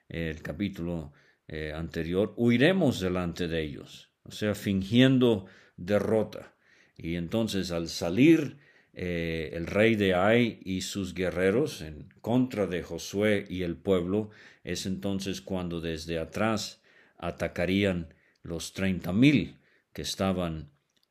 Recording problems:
none

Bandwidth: 15 kHz